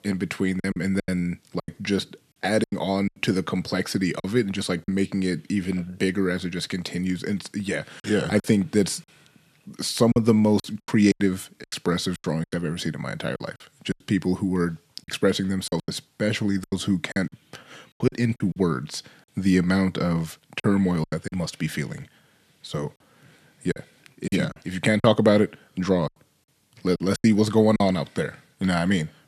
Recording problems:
choppy; very; 10% of the speech affected

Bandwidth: 14 kHz